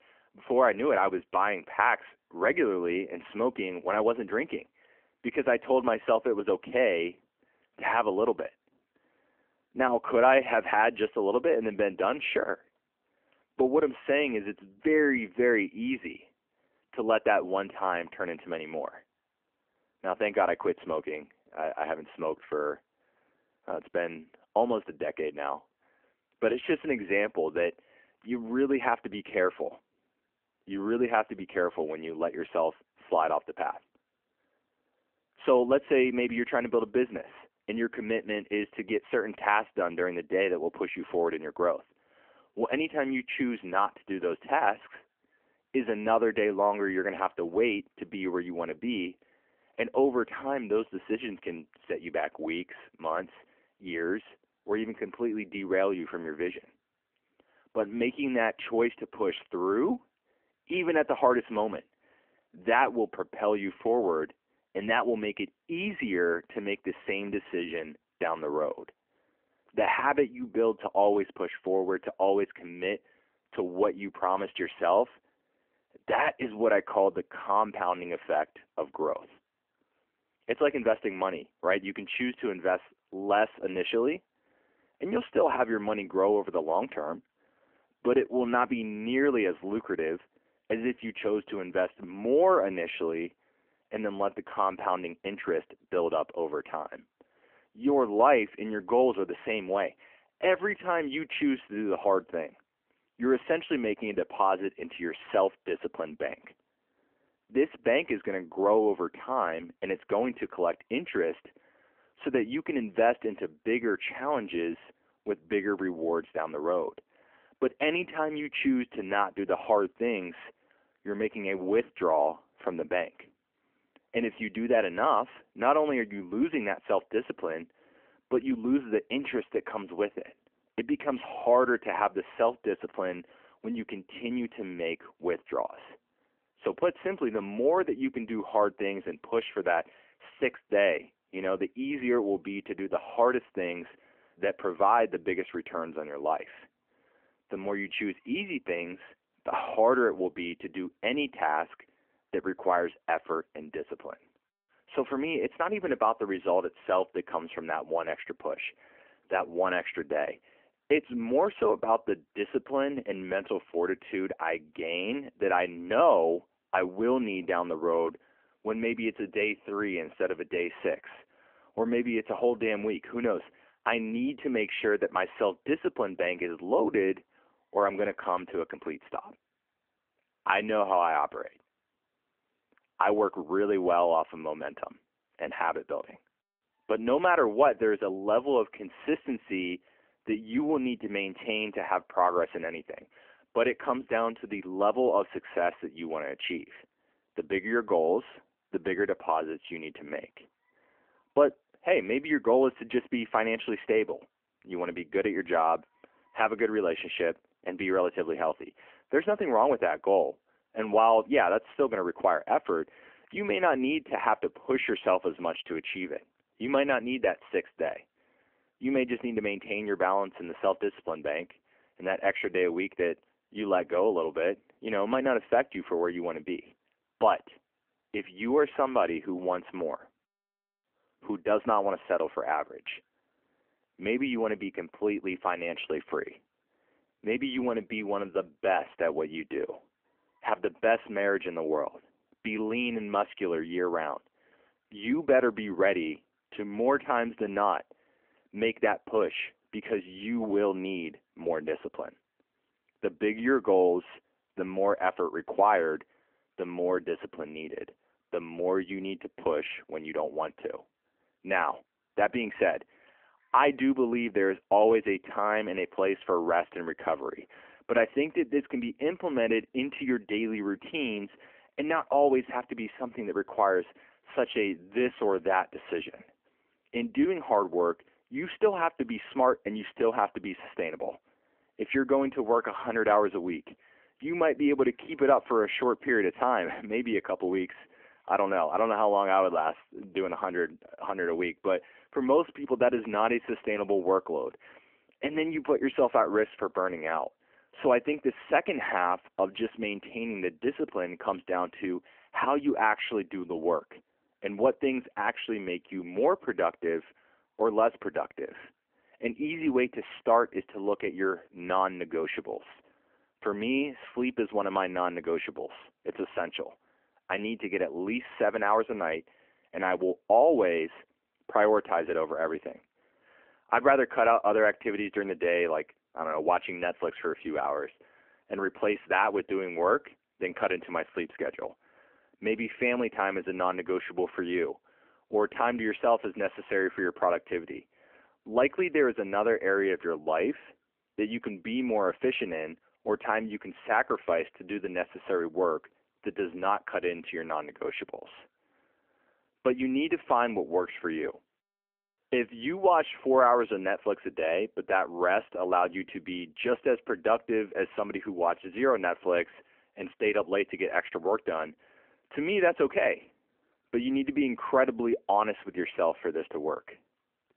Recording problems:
phone-call audio; nothing above 3 kHz

